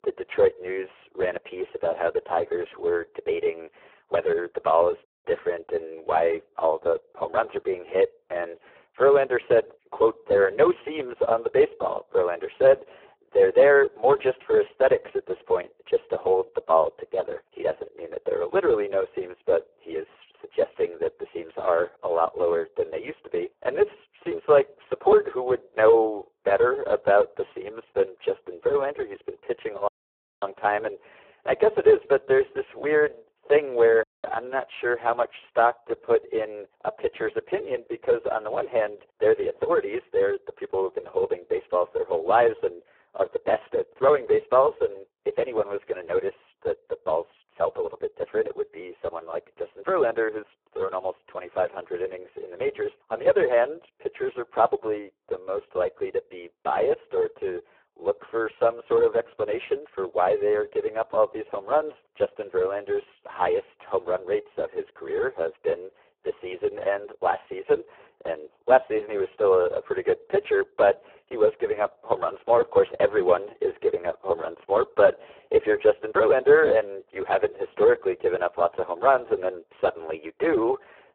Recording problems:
phone-call audio; poor line; nothing above 3.5 kHz
thin; very; fading below 300 Hz
muffled; very slightly; fading above 2 kHz
audio cutting out; at 5 s, at 30 s for 0.5 s and at 34 s

